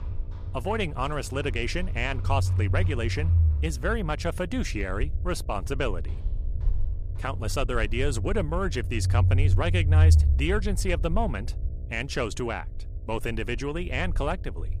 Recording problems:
low rumble; noticeable; throughout; 15 dB below the speech
electrical hum; faint; throughout; 60 Hz, 25 dB below the speech
machinery noise; faint; throughout; 25 dB below the speech

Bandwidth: 14.5 kHz